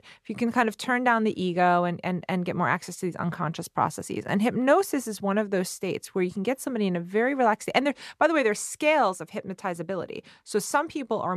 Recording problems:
abrupt cut into speech; at the end

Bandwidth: 13.5 kHz